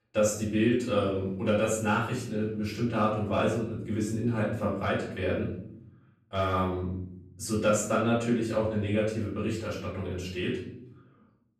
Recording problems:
off-mic speech; far
room echo; noticeable; dies away in 0.8 s

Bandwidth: 14 kHz